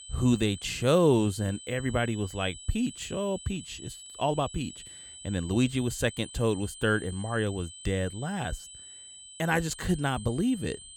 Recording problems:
high-pitched whine; noticeable; throughout; 8 kHz, 15 dB below the speech

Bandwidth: 17.5 kHz